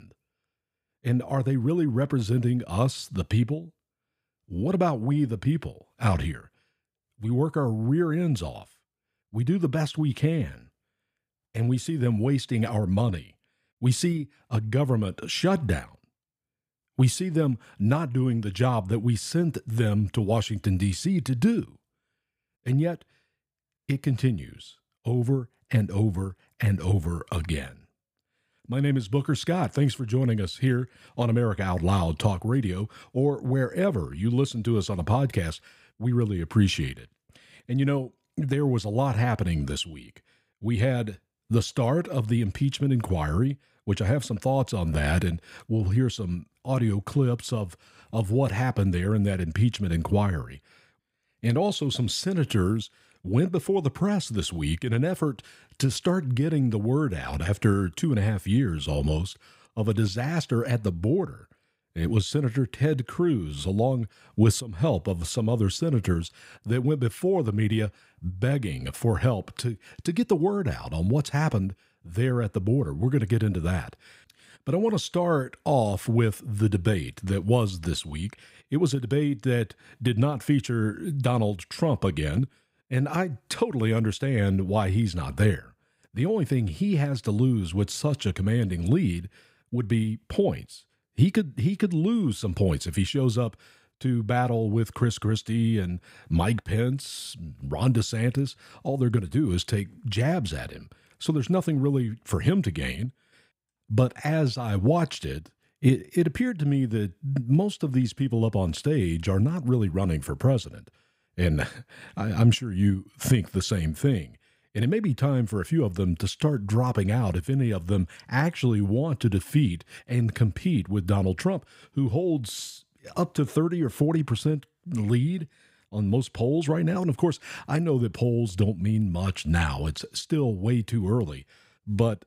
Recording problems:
none

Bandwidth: 15.5 kHz